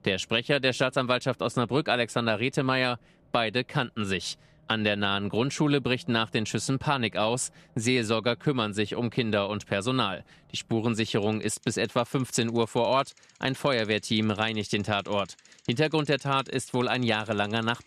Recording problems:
traffic noise; faint; throughout; 30 dB below the speech

